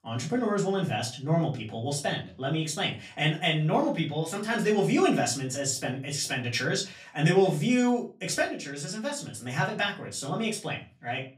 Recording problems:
off-mic speech; far
room echo; very slight; dies away in 0.3 s

